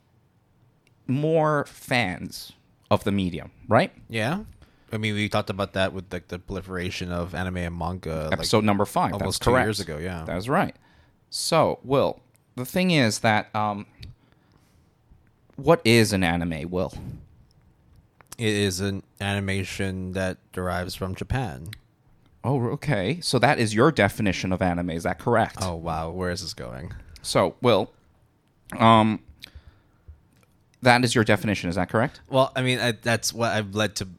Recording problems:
none

